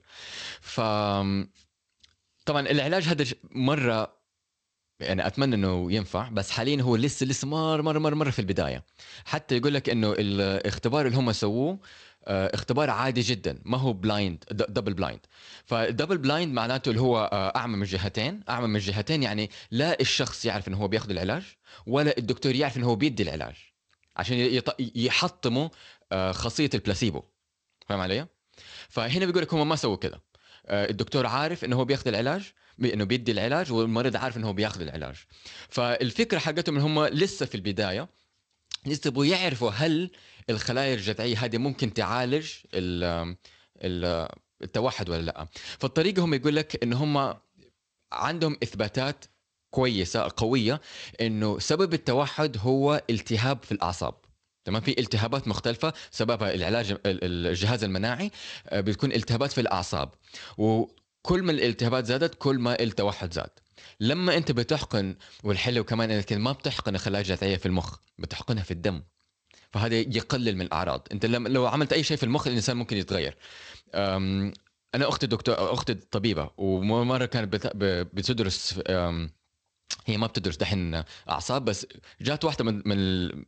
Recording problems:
garbled, watery; slightly; nothing above 8 kHz

